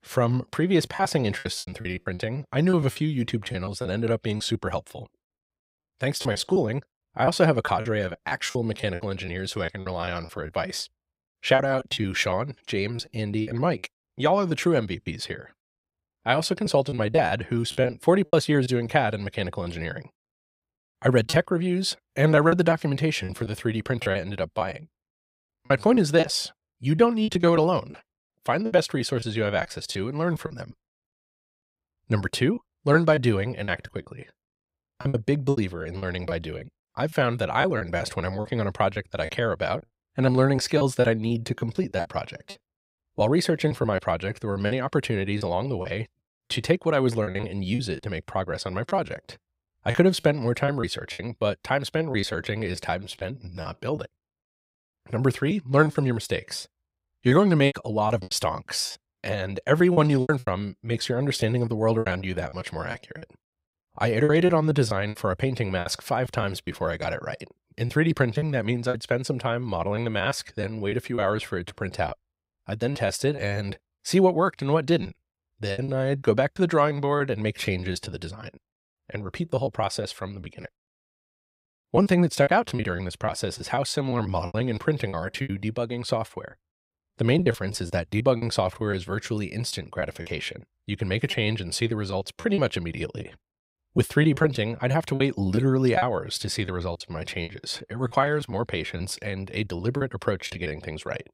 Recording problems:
choppy; very; 10% of the speech affected

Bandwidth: 15.5 kHz